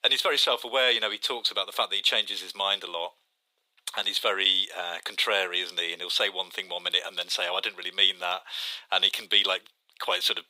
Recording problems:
thin; very; fading below 550 Hz

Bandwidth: 15.5 kHz